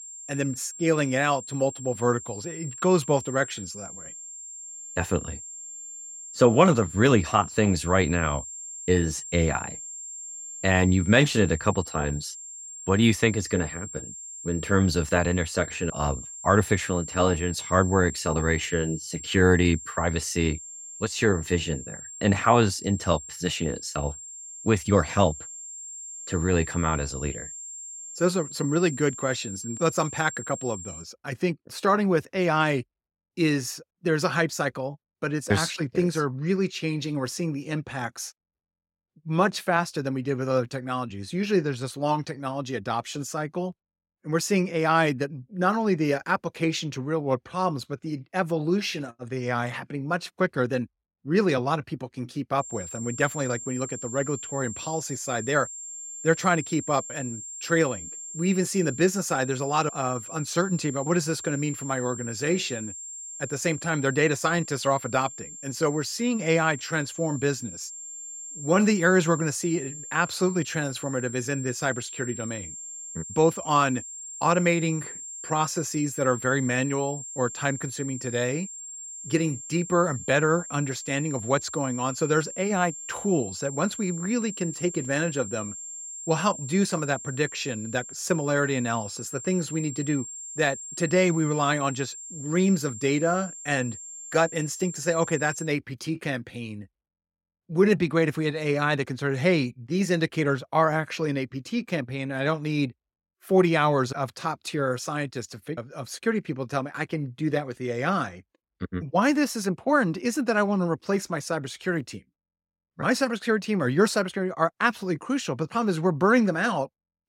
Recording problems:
high-pitched whine; noticeable; until 31 s and from 53 s to 1:36; 7.5 kHz, 10 dB below the speech

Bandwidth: 16 kHz